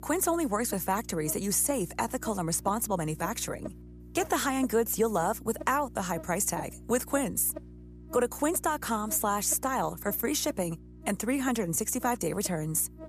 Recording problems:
electrical hum; noticeable; throughout; 60 Hz, 20 dB below the speech

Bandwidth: 14.5 kHz